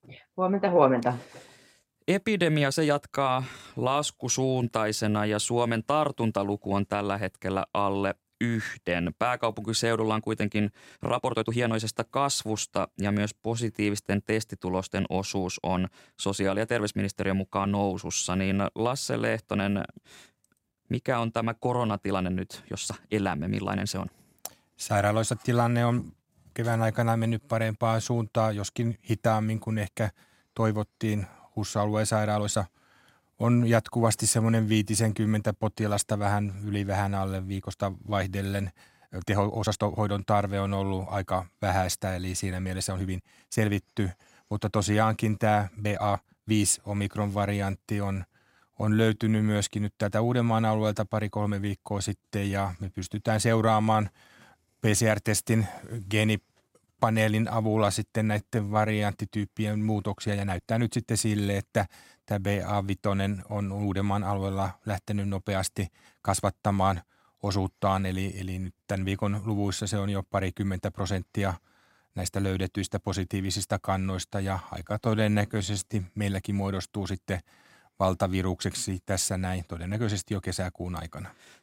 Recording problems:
uneven, jittery; strongly; from 2 s to 1:16

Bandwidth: 16 kHz